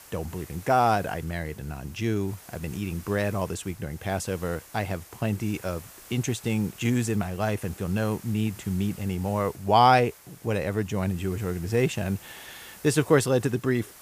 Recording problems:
hiss; noticeable; throughout; 20 dB below the speech

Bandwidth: 15 kHz